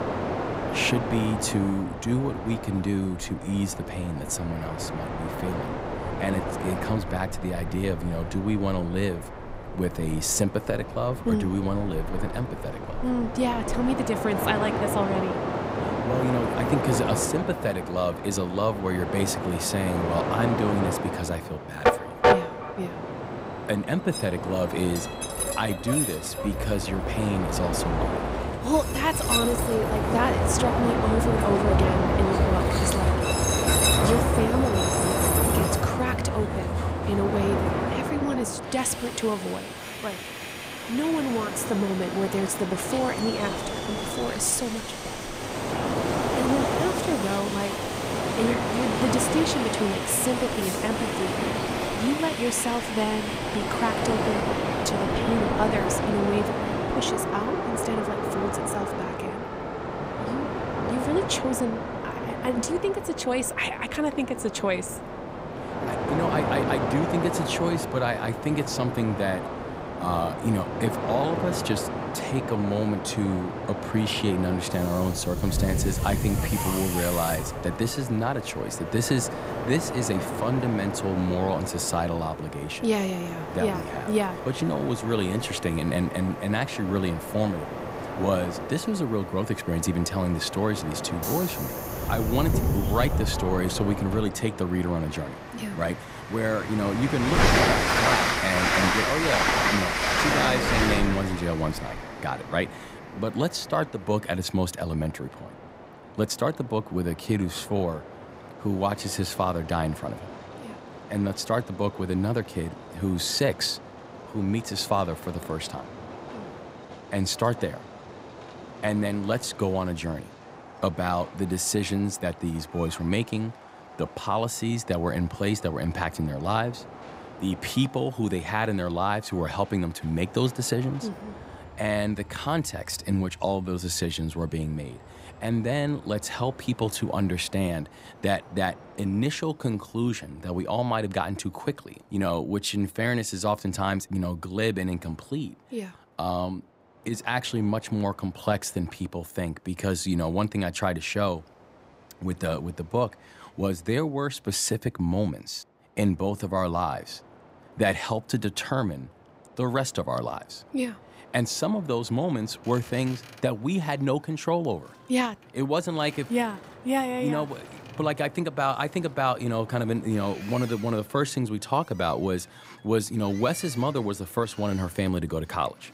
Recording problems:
train or aircraft noise; loud; throughout; 1 dB below the speech

